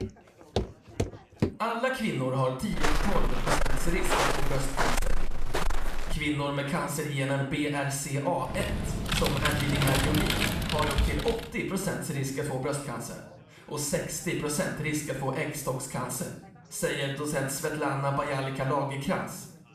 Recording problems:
room echo; noticeable; dies away in 0.6 s
distortion; slight; 10 dB below the speech
off-mic speech; somewhat distant
background chatter; faint; throughout; 3 voices, 25 dB below the speech
footsteps; noticeable; until 1.5 s; peak 2 dB below the speech
footsteps; loud; from 2.5 to 6 s; peak 4 dB above the speech
keyboard typing; loud; from 8.5 to 11 s; peak 4 dB above the speech

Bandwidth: 14.5 kHz